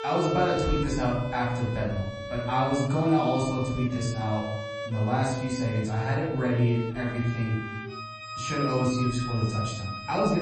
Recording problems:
off-mic speech; far
room echo; noticeable; dies away in 1 s
garbled, watery; slightly; nothing above 8 kHz
background music; loud; throughout; 9 dB below the speech
abrupt cut into speech; at the end

